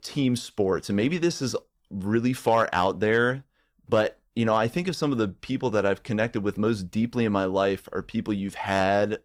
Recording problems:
none

